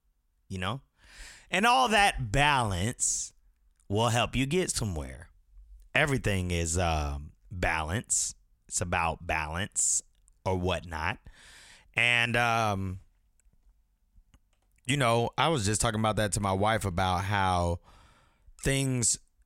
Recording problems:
none

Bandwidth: 16 kHz